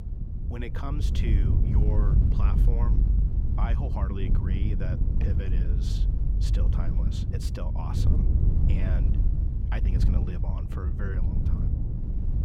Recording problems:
wind noise on the microphone; heavy; as loud as the speech

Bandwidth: 16 kHz